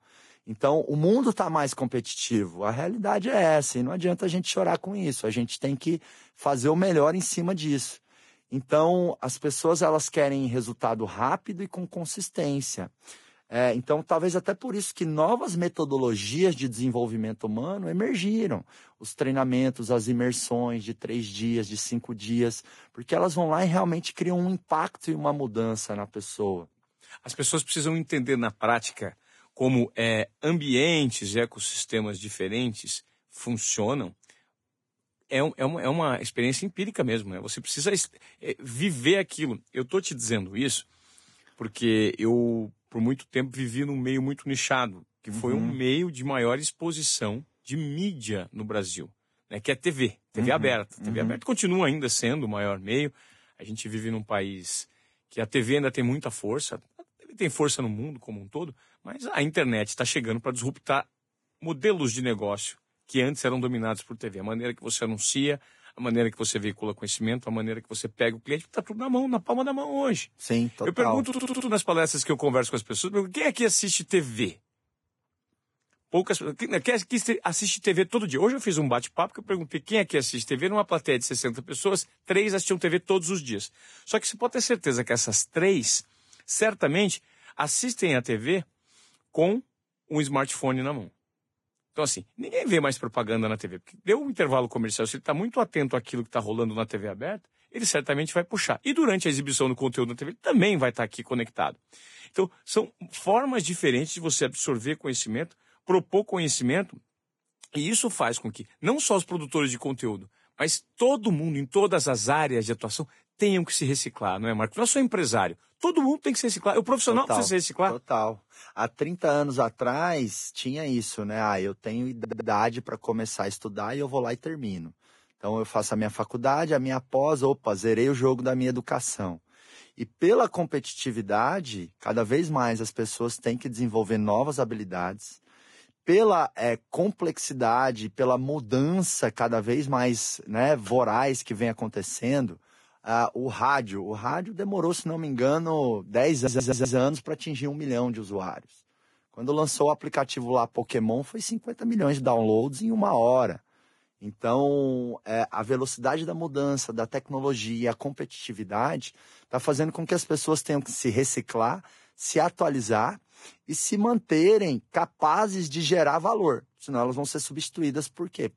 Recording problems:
garbled, watery; badly; nothing above 10.5 kHz
audio stuttering; at 1:11, at 2:02 and at 2:26

